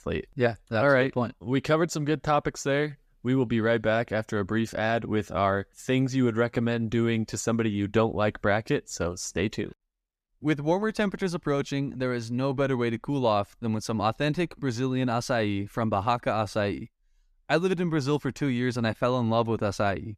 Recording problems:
none

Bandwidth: 14.5 kHz